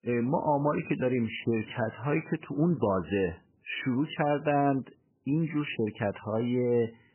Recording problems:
garbled, watery; badly; nothing above 3 kHz

